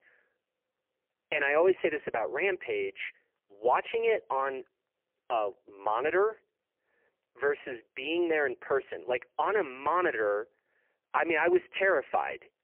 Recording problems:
phone-call audio; poor line; nothing above 3 kHz

